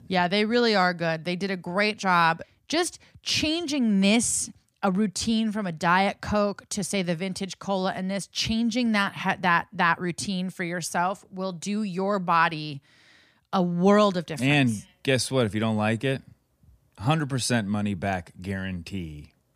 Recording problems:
none

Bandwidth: 15 kHz